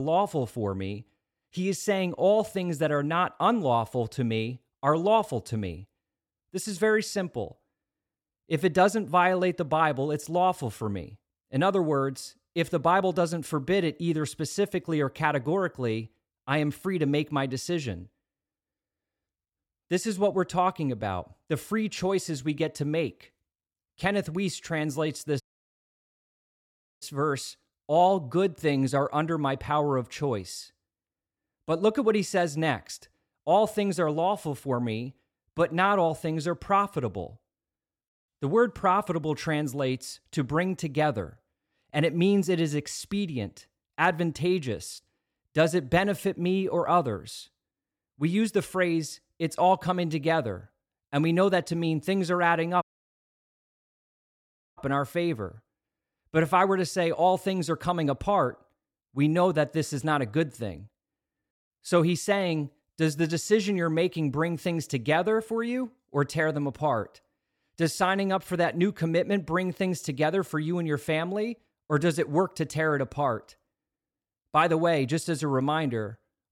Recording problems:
abrupt cut into speech; at the start
audio cutting out; at 25 s for 1.5 s and at 53 s for 2 s

